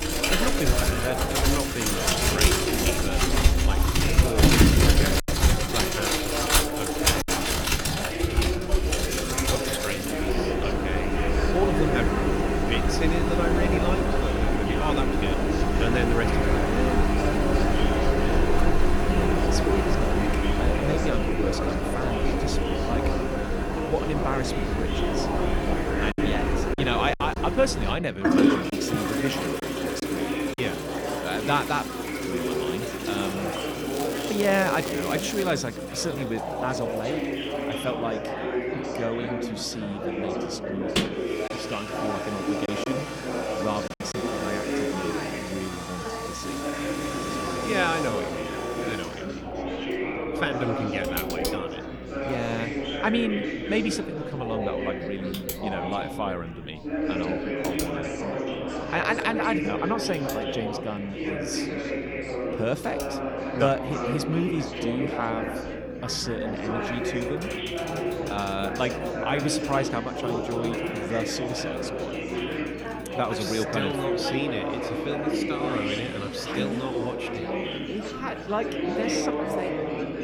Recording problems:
household noises; very loud; throughout; 4 dB above the speech
chatter from many people; very loud; throughout; as loud as the speech
crackling; loud; from 34 to 36 s; 7 dB below the speech
electrical hum; faint; throughout; 60 Hz, 25 dB below the speech
choppy; very; from 5 to 7.5 s, from 26 to 31 s and from 43 to 44 s; 5% of the speech affected

